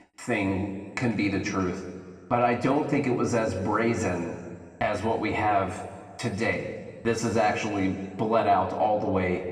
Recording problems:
room echo; noticeable; dies away in 1.4 s
off-mic speech; somewhat distant

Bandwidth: 15.5 kHz